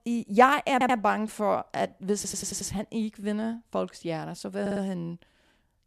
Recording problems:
audio stuttering; at 0.5 s, at 2 s and at 4.5 s

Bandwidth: 13.5 kHz